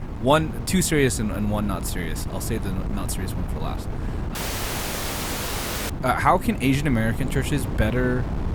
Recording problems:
wind noise on the microphone; occasional gusts; 15 dB below the speech
audio cutting out; at 4.5 s for 1.5 s

